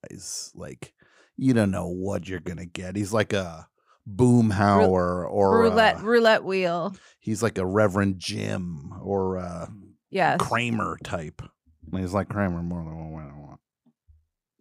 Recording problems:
none

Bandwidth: 15.5 kHz